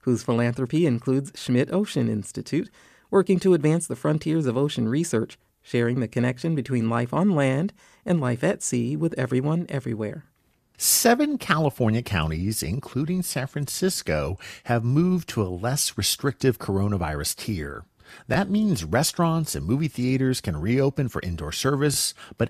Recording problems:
none

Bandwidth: 14.5 kHz